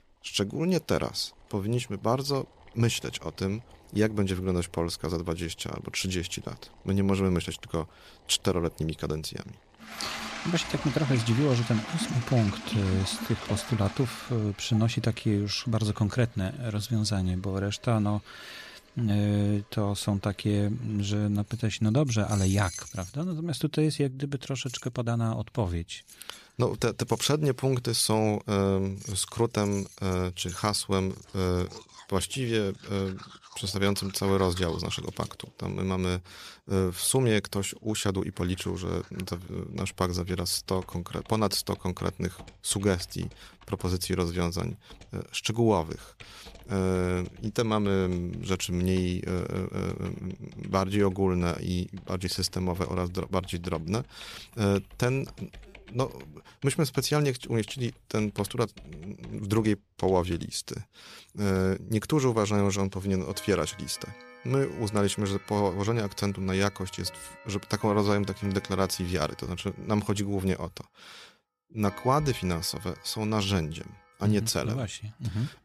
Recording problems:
household noises; noticeable; throughout; 15 dB below the speech

